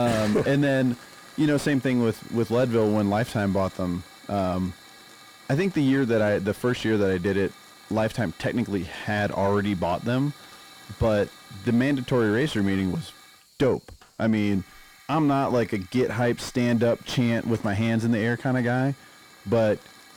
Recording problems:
distortion; slight; 10 dB below the speech
hiss; faint; throughout; 20 dB below the speech
abrupt cut into speech; at the start

